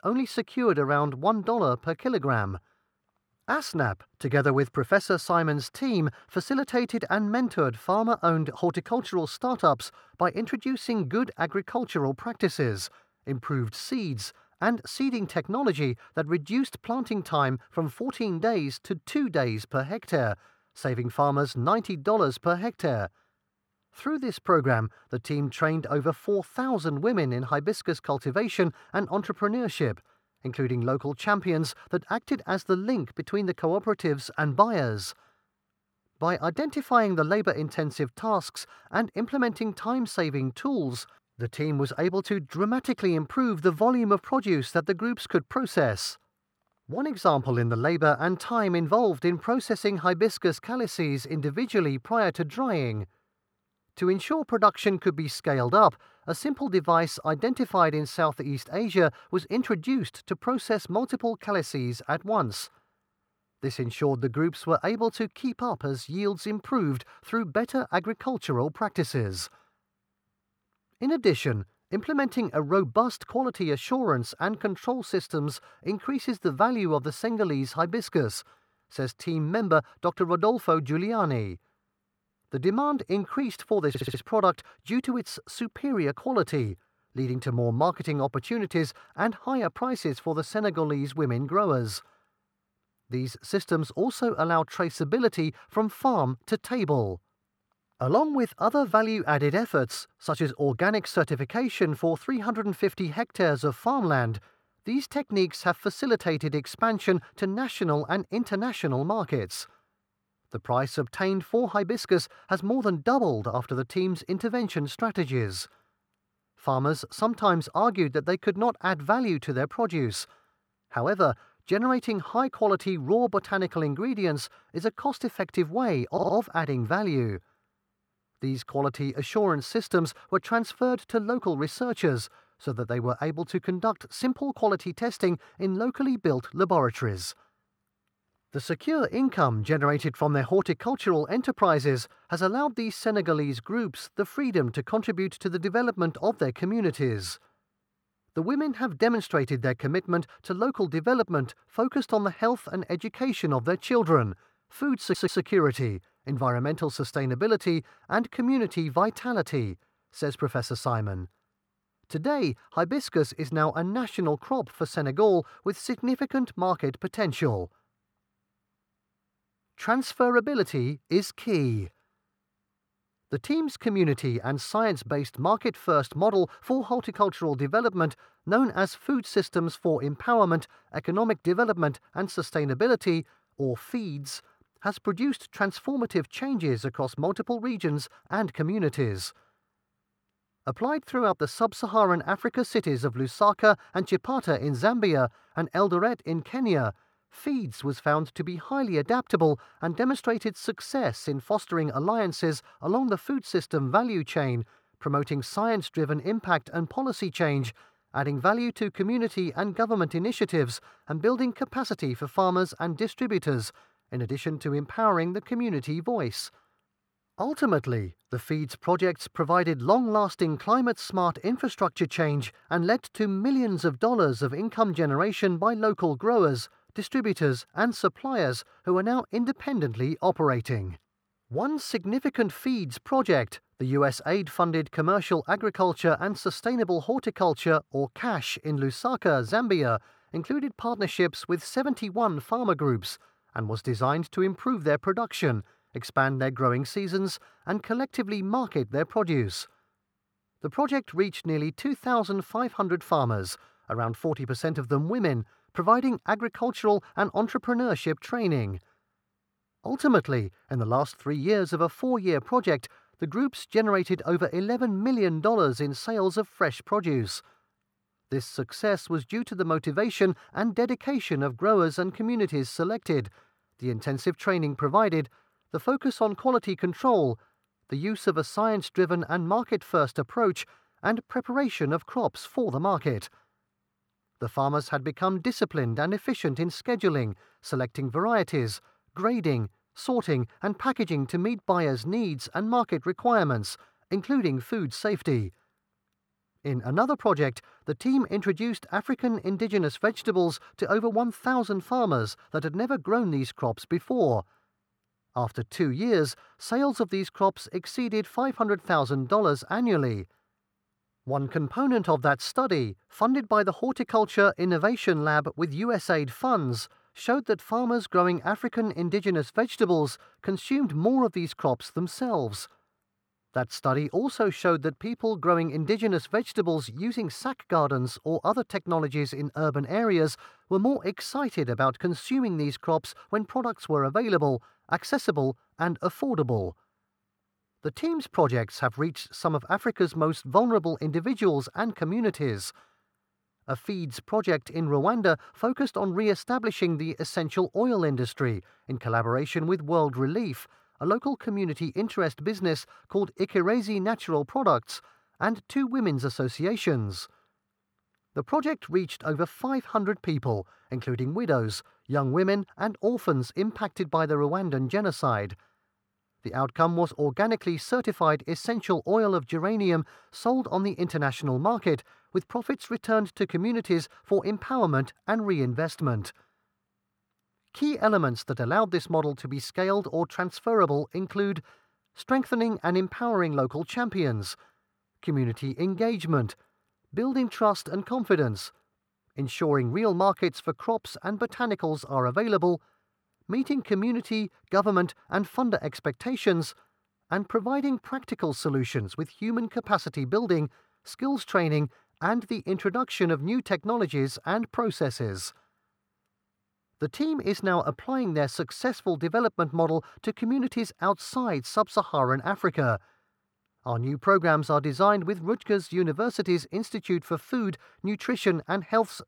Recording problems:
muffled; slightly; fading above 3 kHz
audio stuttering; at 1:24, at 2:06 and at 2:35

